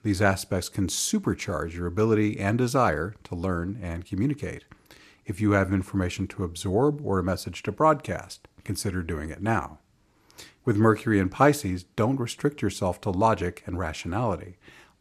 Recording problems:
none

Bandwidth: 14.5 kHz